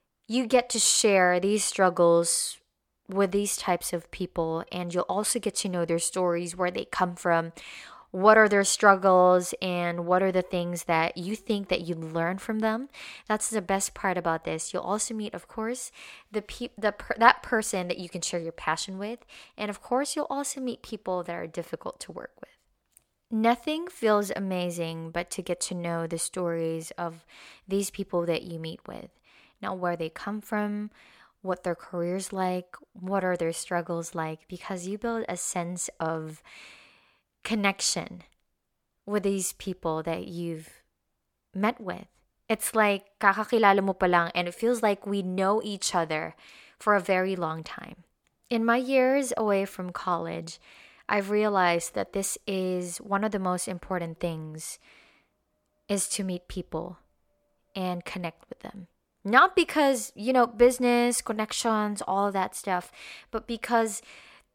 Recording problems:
none

